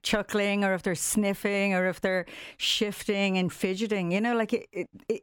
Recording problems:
none

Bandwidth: 18 kHz